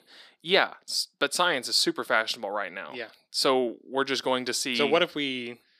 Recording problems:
thin; very slightly; fading below 250 Hz

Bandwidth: 14.5 kHz